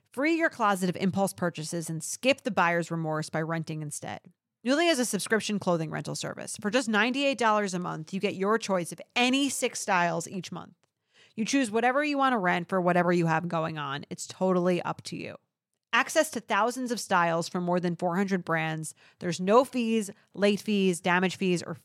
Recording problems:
none

